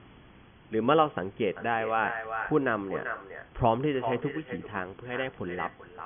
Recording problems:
echo of what is said; strong; from 1.5 s on; 390 ms later, 8 dB below the speech
high frequencies cut off; severe; nothing above 3.5 kHz
hiss; faint; throughout; 25 dB below the speech

